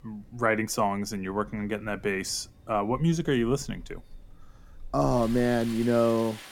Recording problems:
rain or running water; noticeable; throughout; 20 dB below the speech

